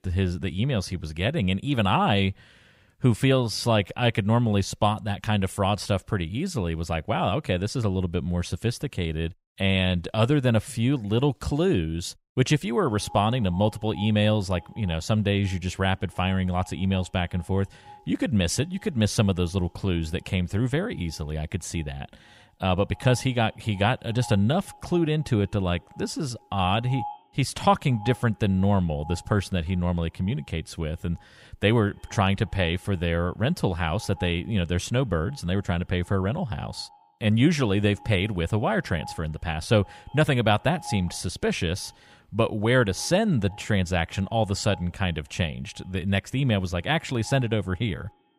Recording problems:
echo of what is said; faint; from 13 s on; 100 ms later, 20 dB below the speech

